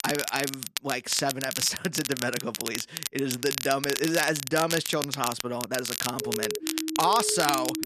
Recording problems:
crackle, like an old record; loud; 4 dB below the speech
siren; noticeable; from 6 s on; peak 5 dB below the speech

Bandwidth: 14 kHz